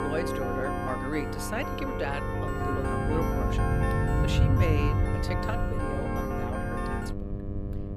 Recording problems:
background music; very loud; throughout; 2 dB above the speech
electrical hum; loud; throughout; 50 Hz, 7 dB below the speech
low rumble; loud; throughout; 8 dB below the speech

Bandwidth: 15 kHz